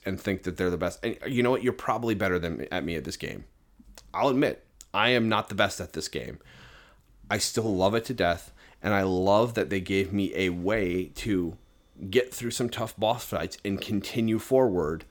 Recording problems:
none

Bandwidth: 18 kHz